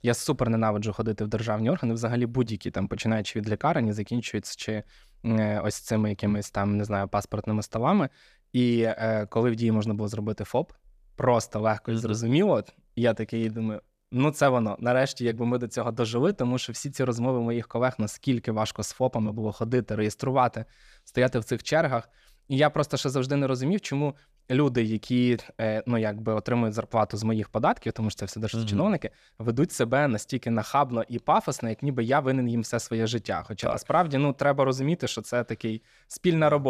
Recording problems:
abrupt cut into speech; at the end

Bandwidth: 14.5 kHz